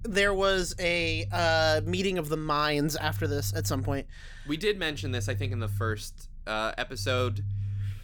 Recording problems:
low rumble; faint; throughout; 20 dB below the speech

